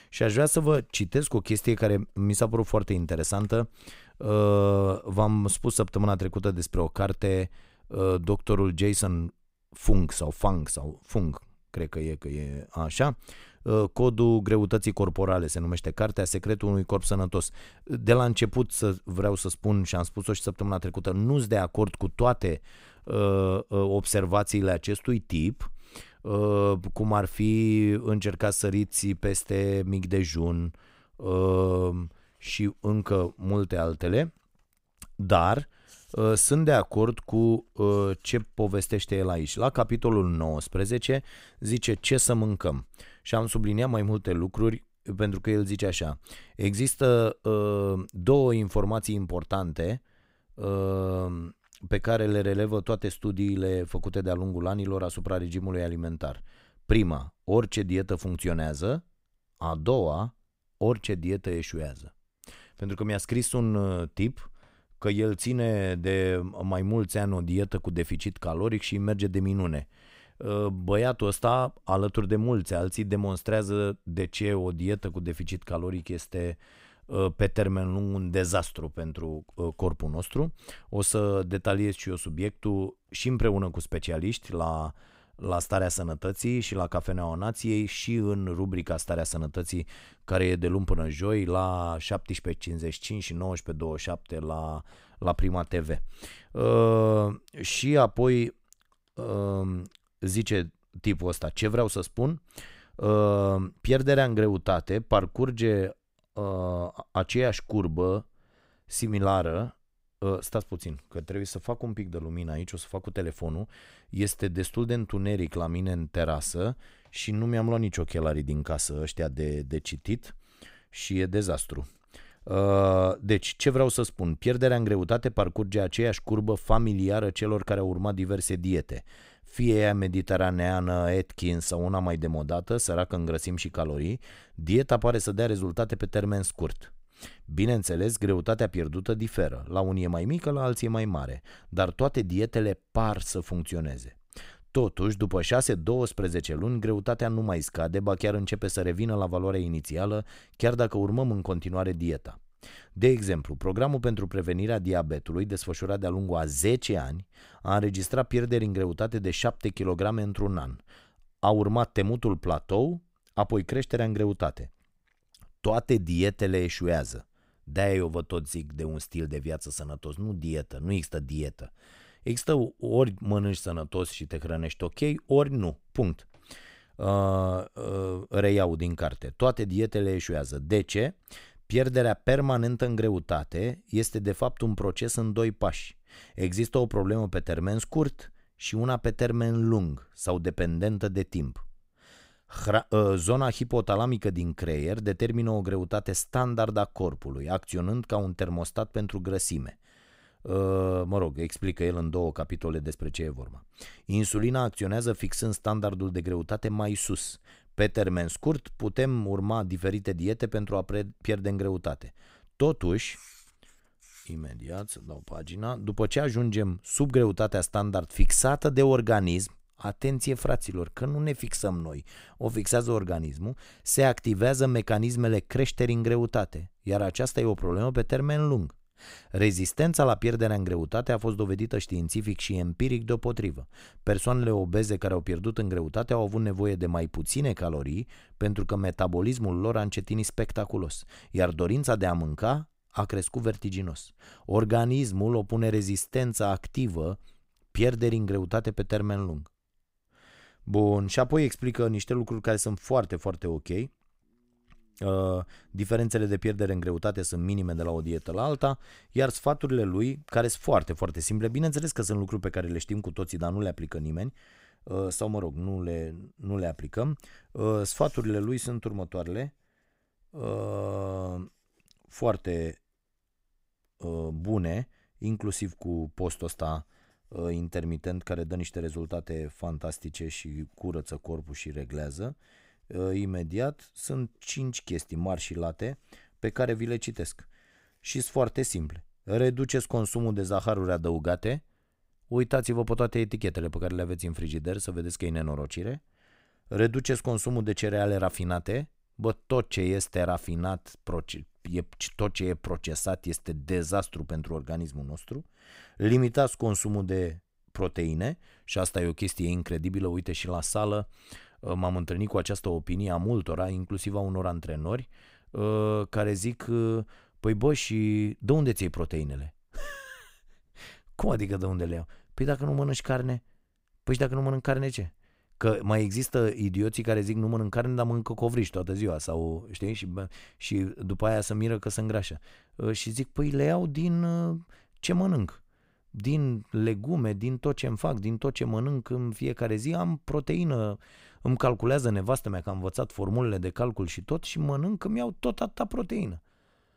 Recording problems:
none

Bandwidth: 15.5 kHz